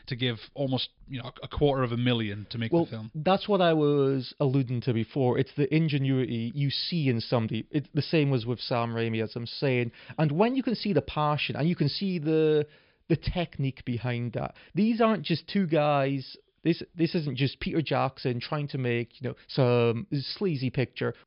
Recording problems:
high frequencies cut off; noticeable; nothing above 5.5 kHz

